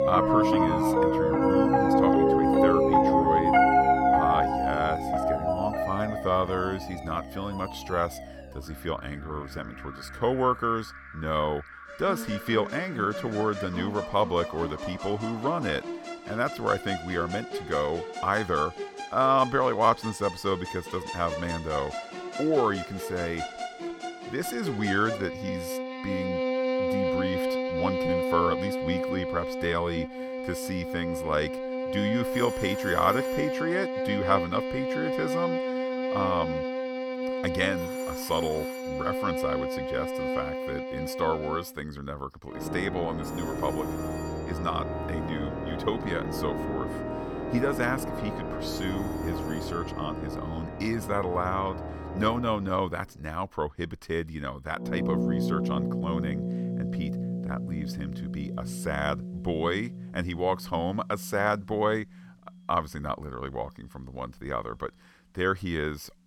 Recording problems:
background music; very loud; throughout; 1 dB above the speech
alarms or sirens; noticeable; throughout; 15 dB below the speech

